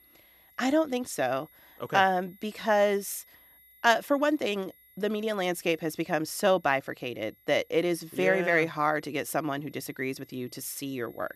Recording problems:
high-pitched whine; faint; throughout; 11.5 kHz, 30 dB below the speech

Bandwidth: 13.5 kHz